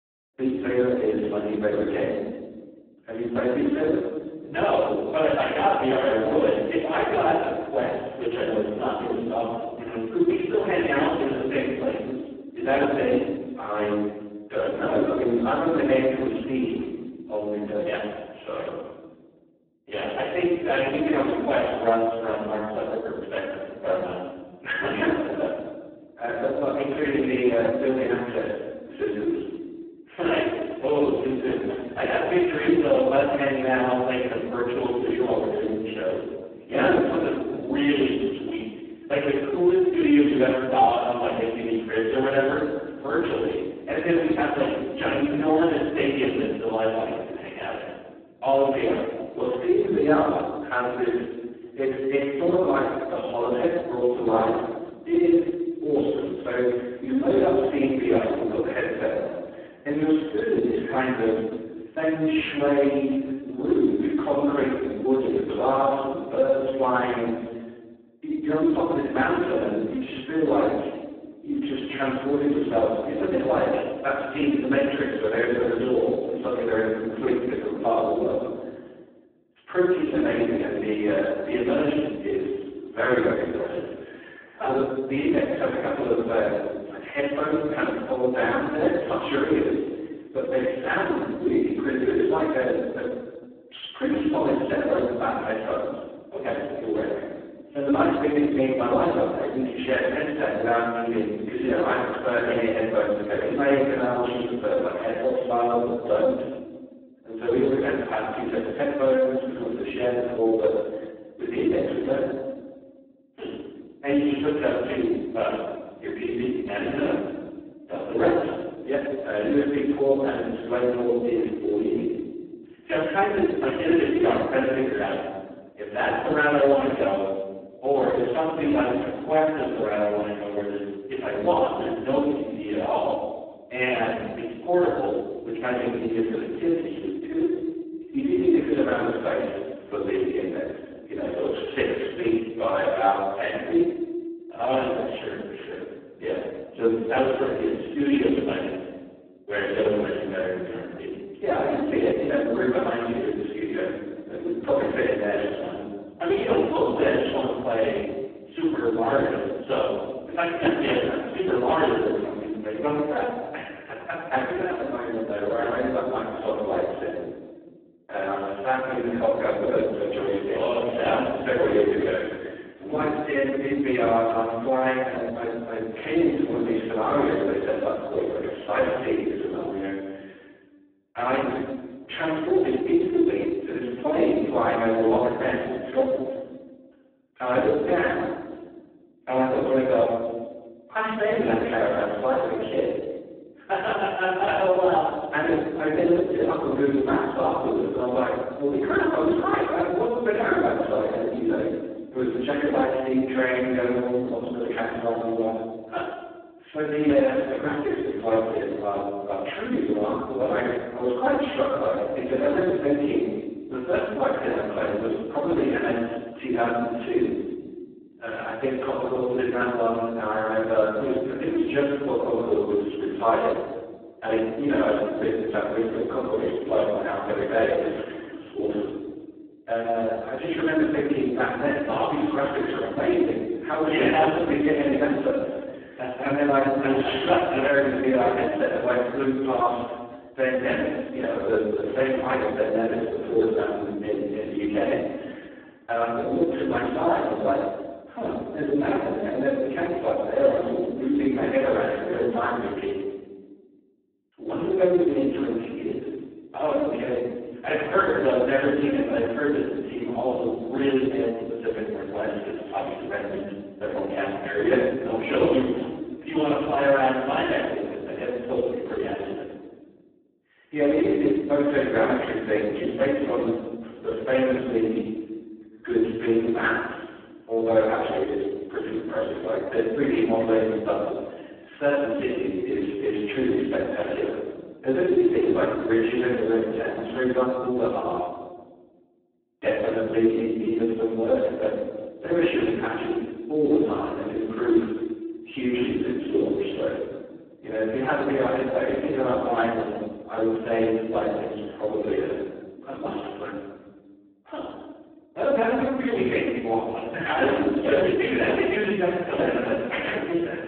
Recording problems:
phone-call audio; poor line
room echo; strong; dies away in 1.3 s
off-mic speech; far

